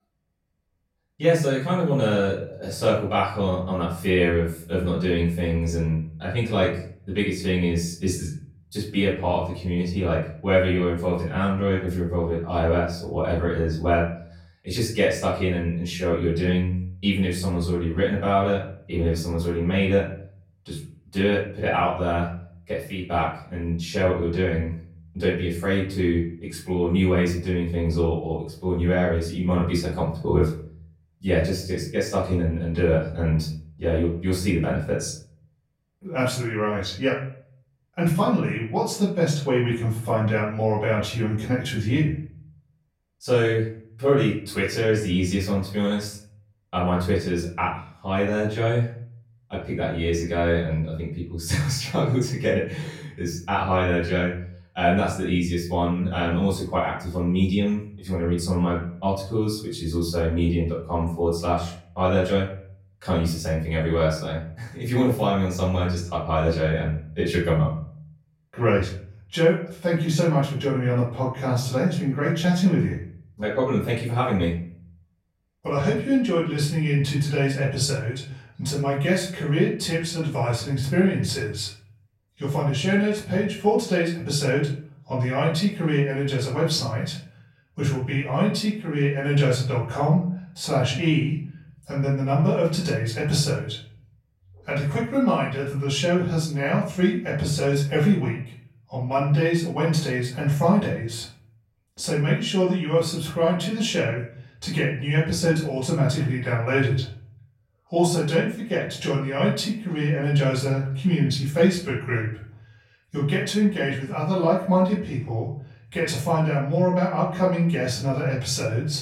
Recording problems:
off-mic speech; far
room echo; noticeable; dies away in 0.5 s

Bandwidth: 16 kHz